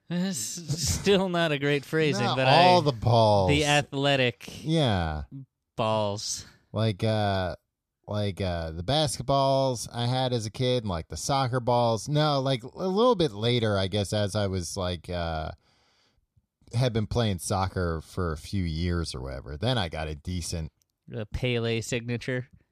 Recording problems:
none

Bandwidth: 14.5 kHz